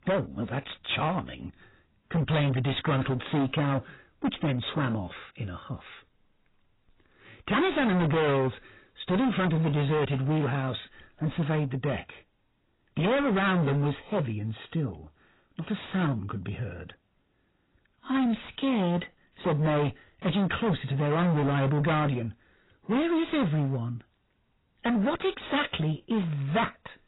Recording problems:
distortion; heavy; 18% of the sound clipped
garbled, watery; badly; nothing above 4 kHz

